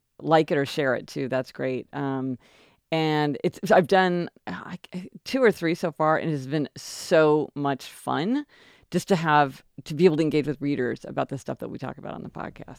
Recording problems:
none

